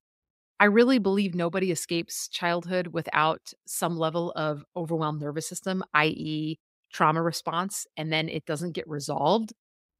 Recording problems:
none

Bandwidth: 15.5 kHz